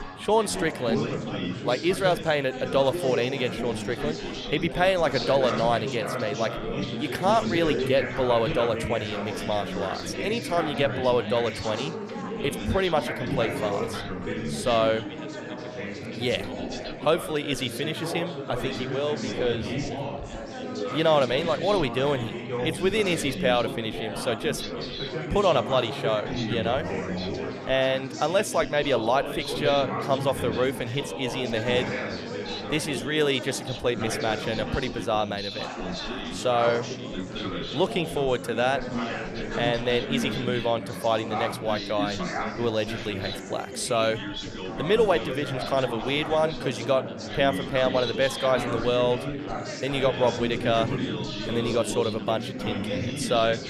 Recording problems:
chatter from many people; loud; throughout; 5 dB below the speech

